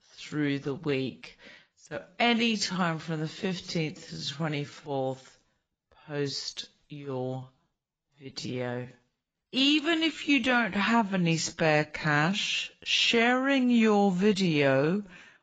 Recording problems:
garbled, watery; badly; nothing above 7.5 kHz
wrong speed, natural pitch; too slow; 0.6 times normal speed

